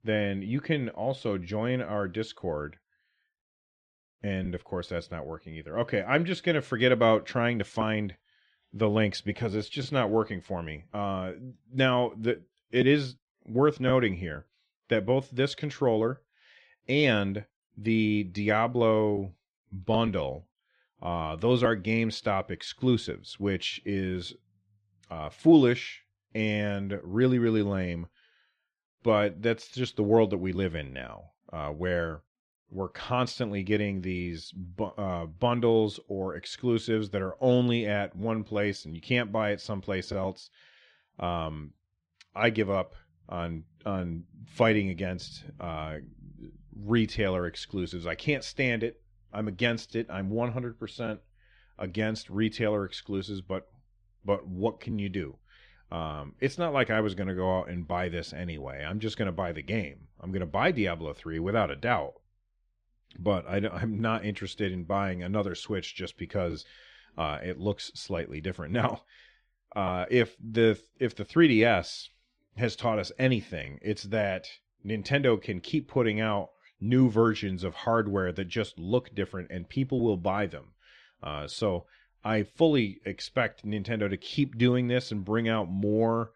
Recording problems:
muffled; slightly; fading above 3 kHz

